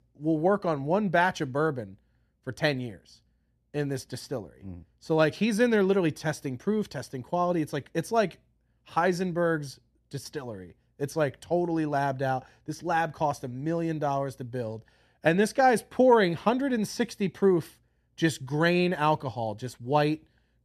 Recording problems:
none

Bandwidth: 14 kHz